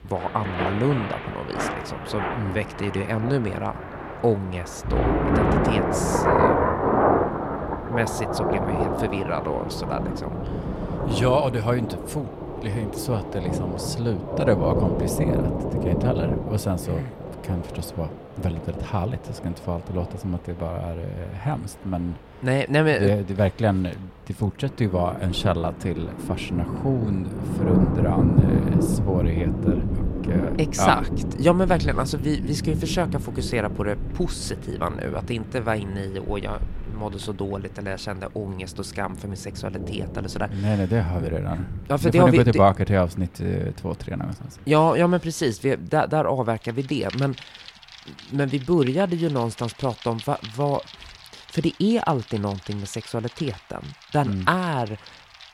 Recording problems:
rain or running water; loud; throughout; 2 dB below the speech

